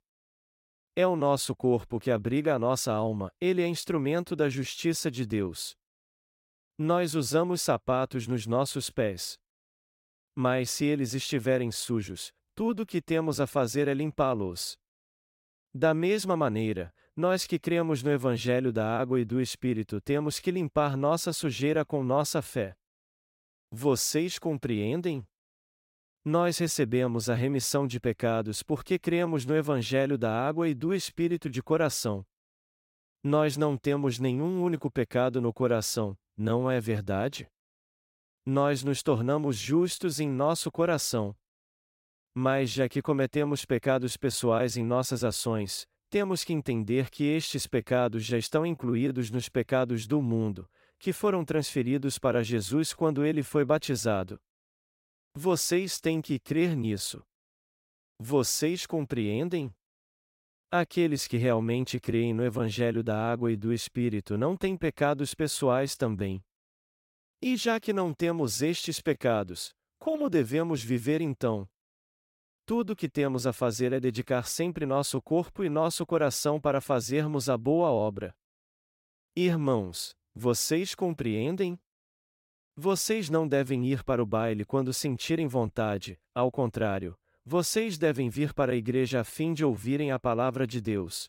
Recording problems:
none

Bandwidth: 16 kHz